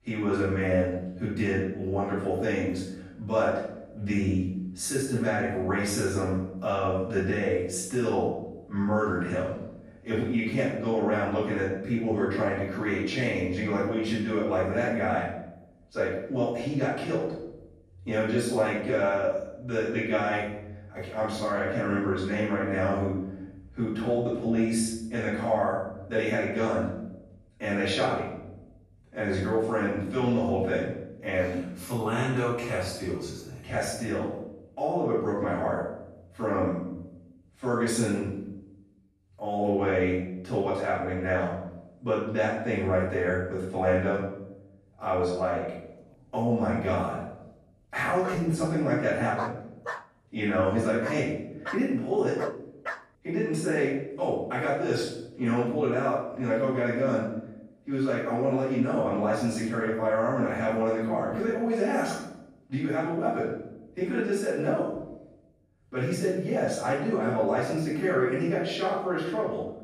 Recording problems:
room echo; strong; dies away in 0.7 s
off-mic speech; far
dog barking; noticeable; from 48 to 53 s; peak 9 dB below the speech

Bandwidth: 14.5 kHz